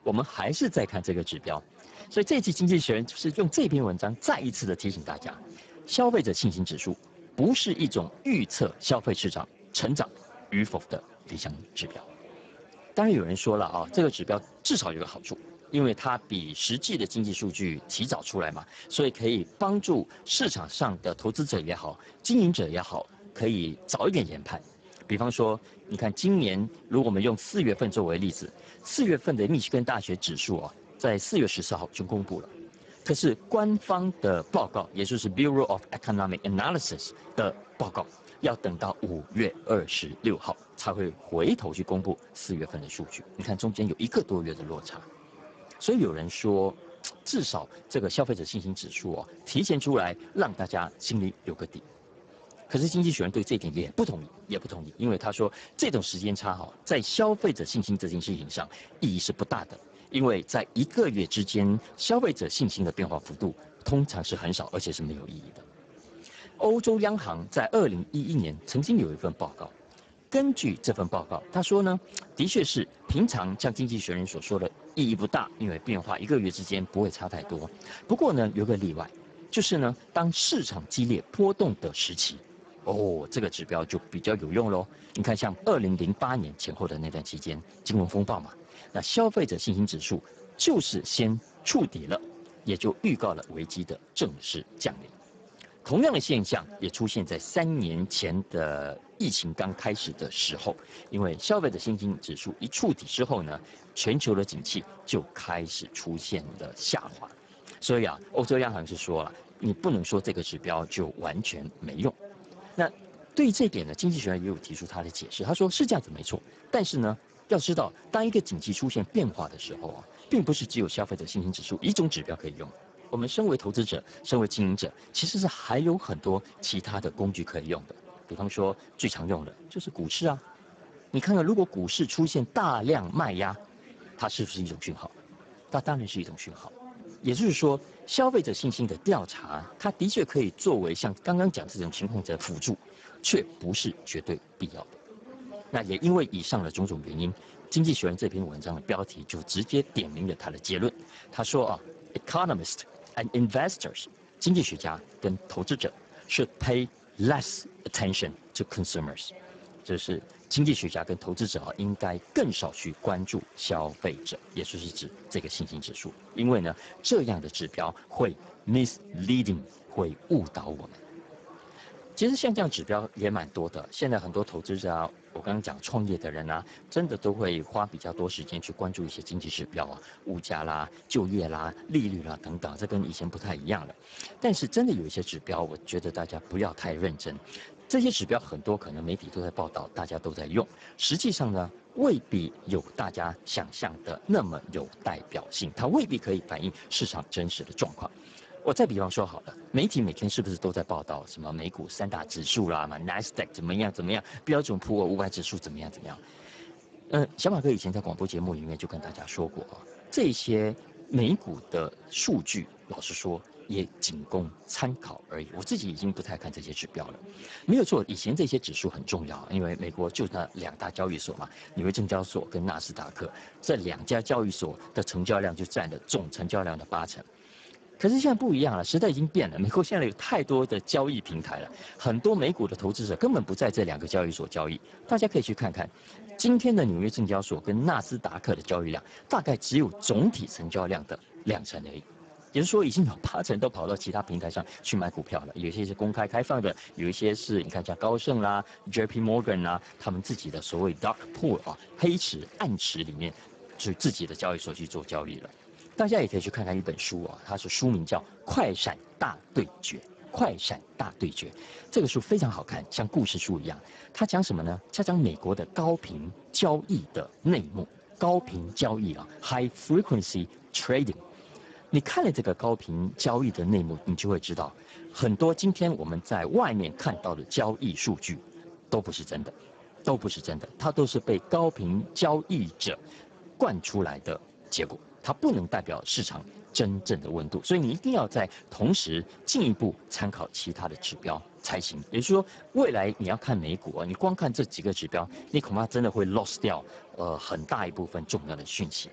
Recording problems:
garbled, watery; badly; nothing above 7.5 kHz
murmuring crowd; faint; throughout; 20 dB below the speech

